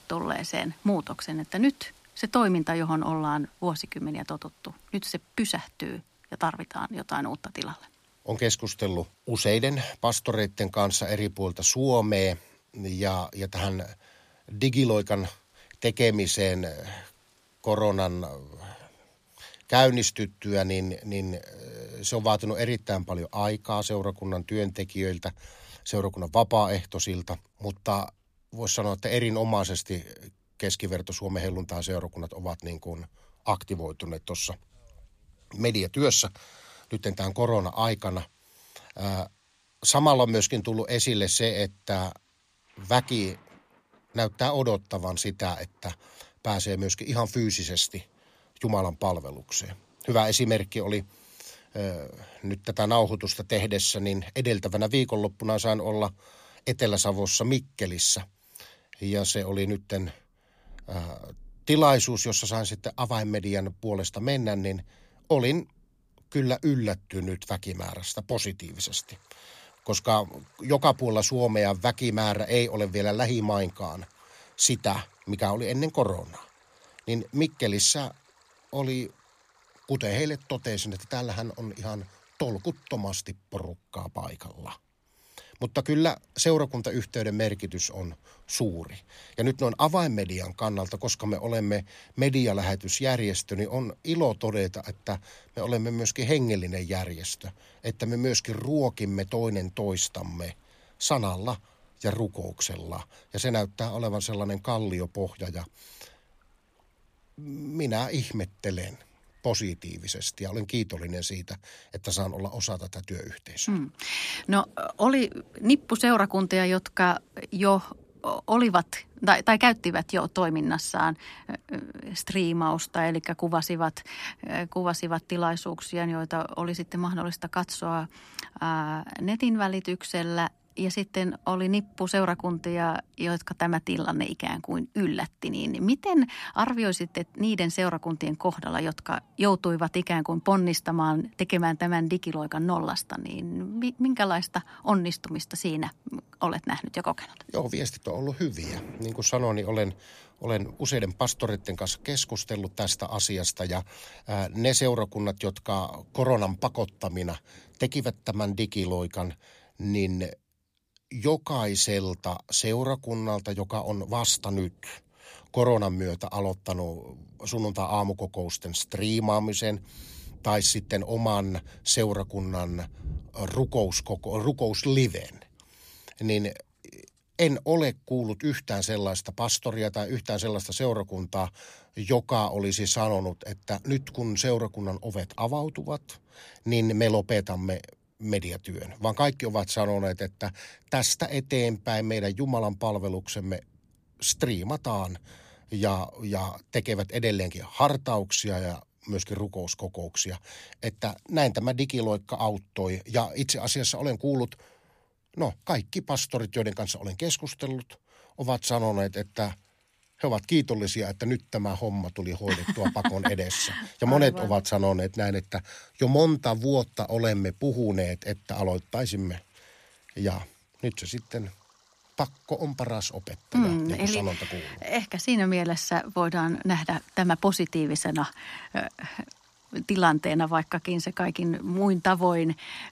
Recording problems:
rain or running water; faint; throughout; 30 dB below the speech

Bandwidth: 15 kHz